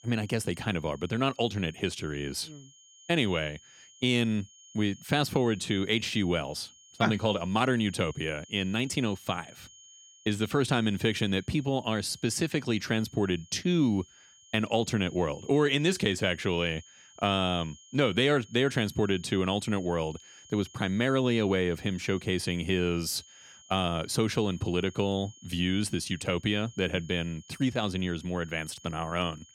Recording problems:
high-pitched whine; faint; throughout; 3 kHz, 25 dB below the speech

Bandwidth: 16.5 kHz